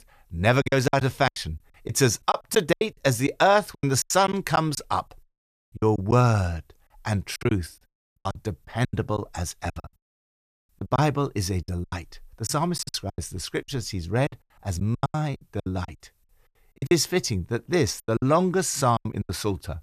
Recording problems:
choppy; very; 15% of the speech affected

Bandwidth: 14.5 kHz